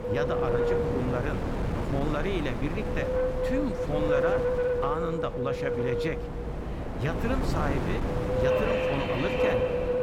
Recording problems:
wind noise on the microphone; heavy; 4 dB above the speech
train or aircraft noise; loud; throughout; 4 dB below the speech

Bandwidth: 17.5 kHz